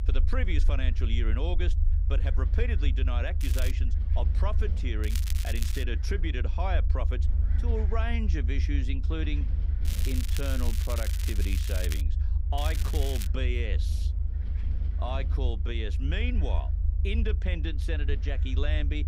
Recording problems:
crackling; loud; 4 times, first at 3.5 s; 4 dB below the speech
wind noise on the microphone; occasional gusts; 20 dB below the speech
low rumble; noticeable; throughout; 10 dB below the speech

